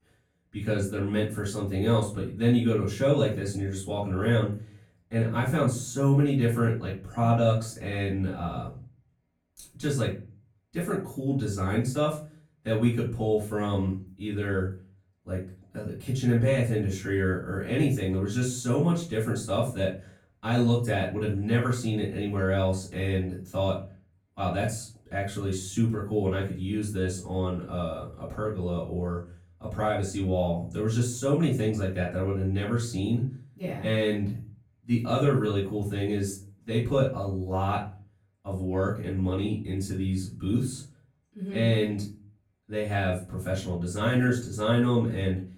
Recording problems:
off-mic speech; far
room echo; slight; dies away in 0.4 s

